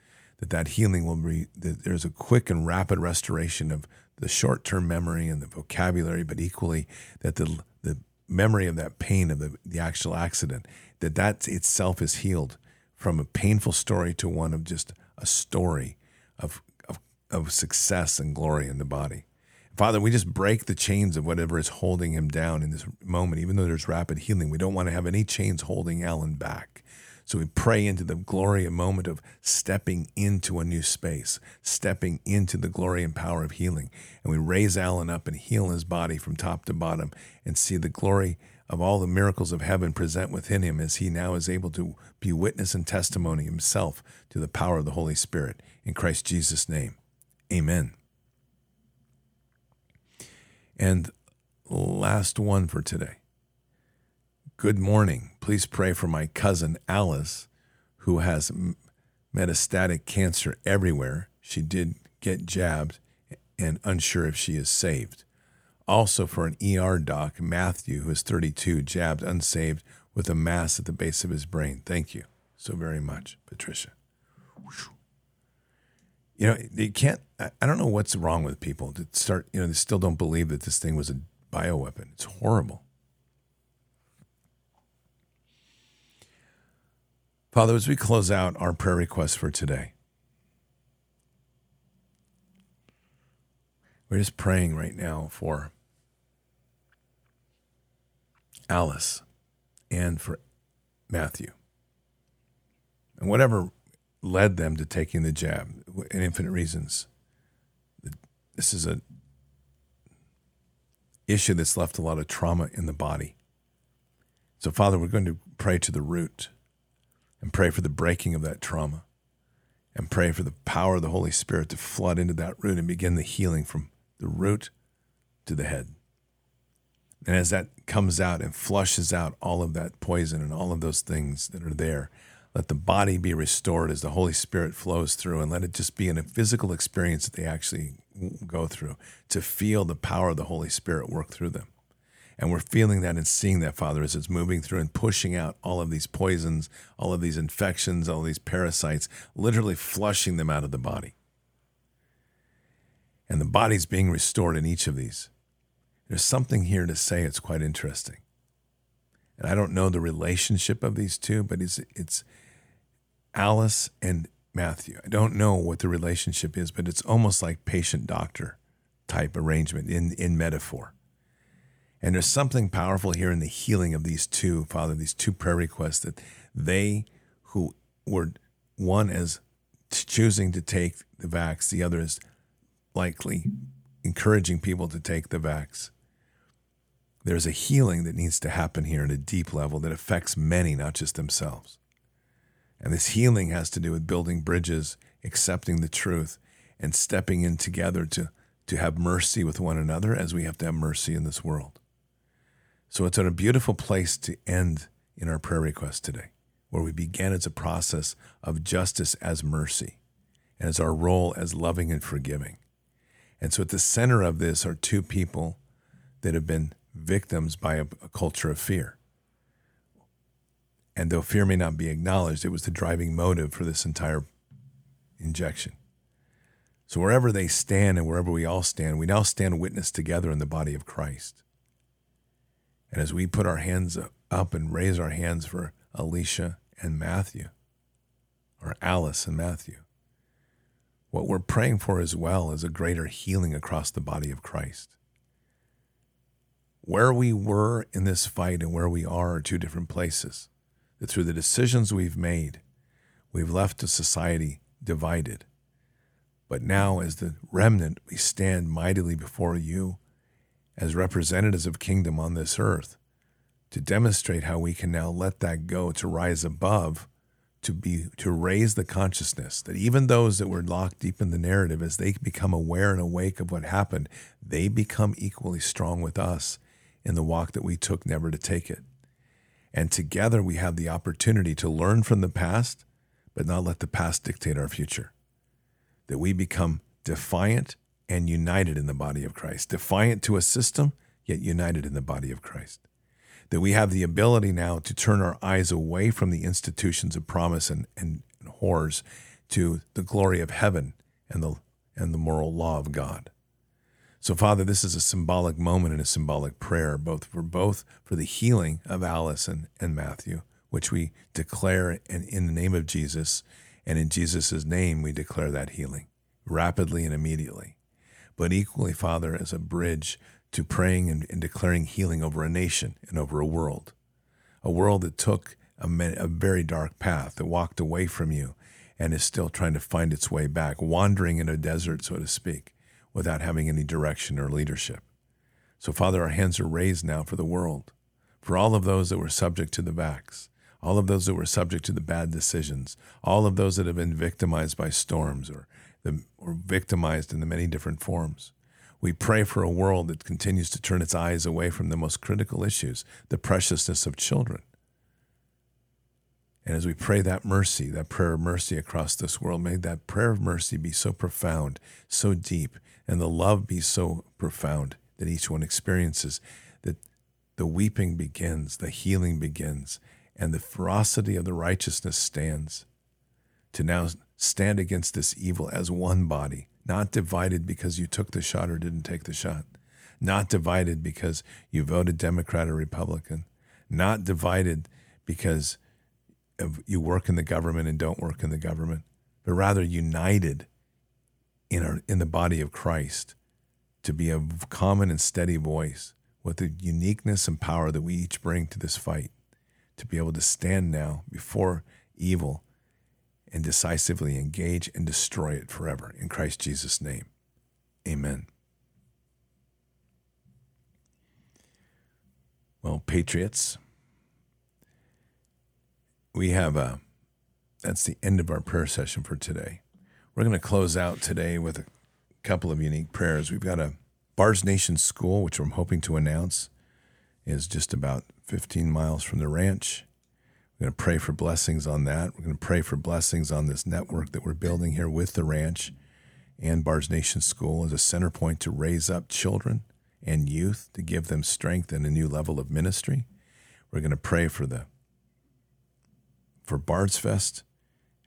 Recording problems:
none

